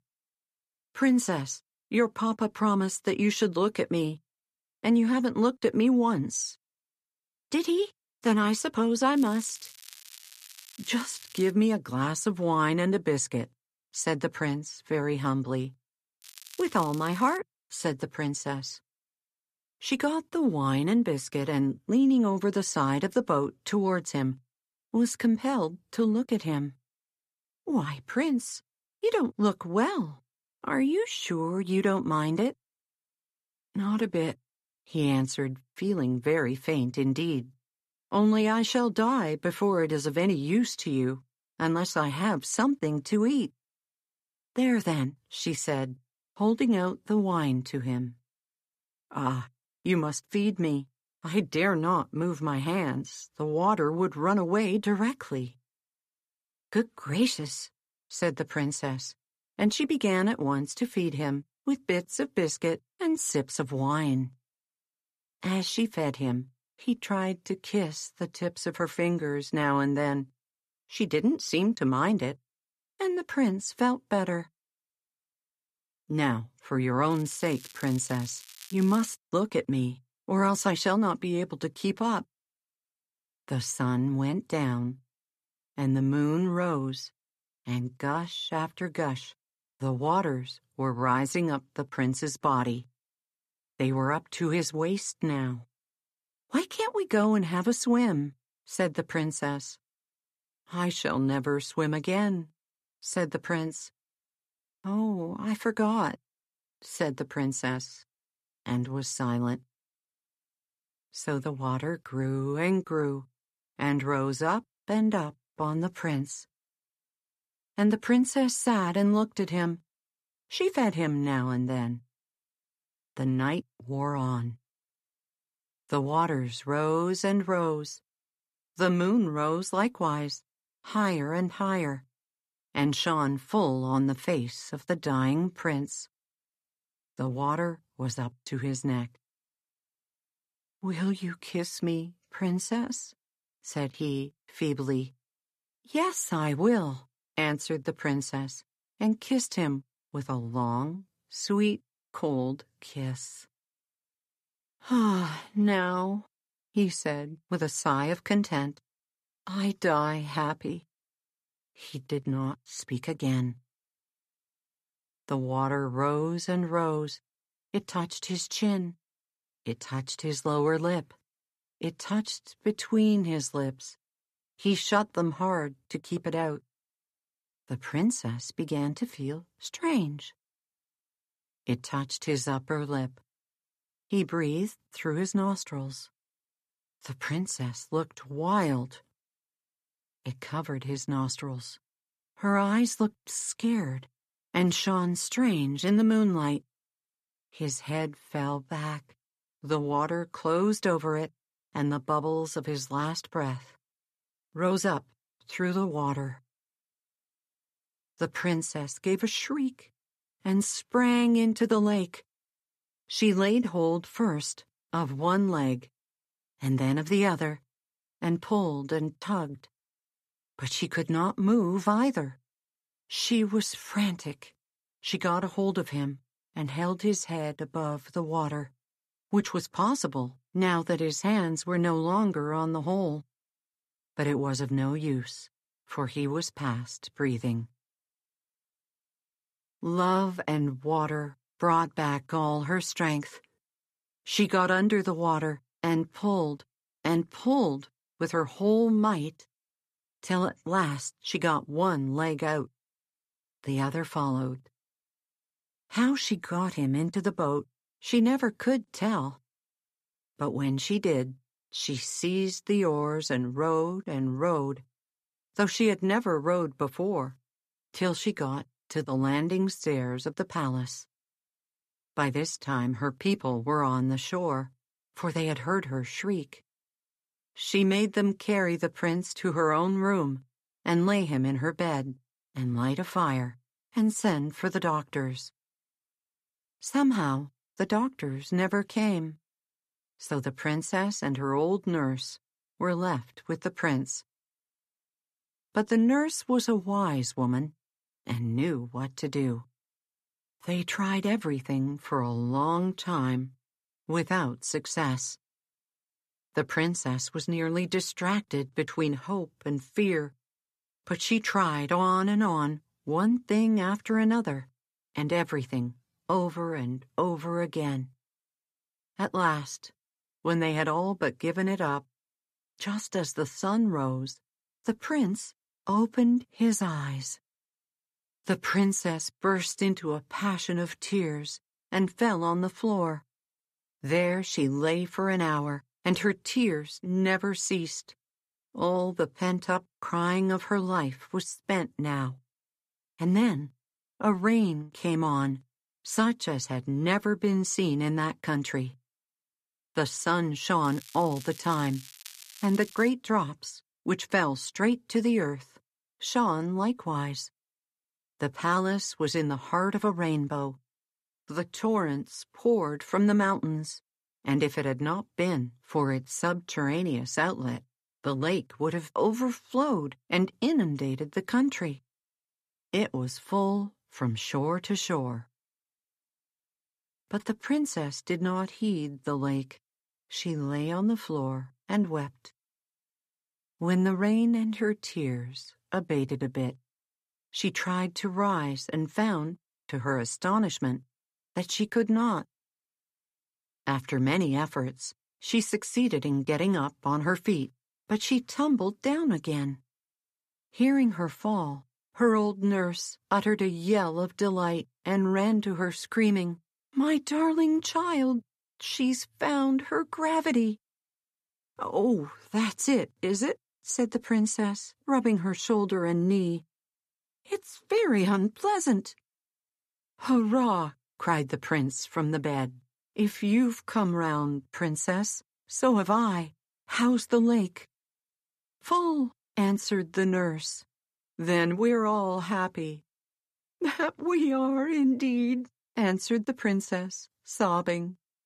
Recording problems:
crackling; noticeable; 4 times, first at 9 s; 20 dB below the speech

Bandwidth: 14.5 kHz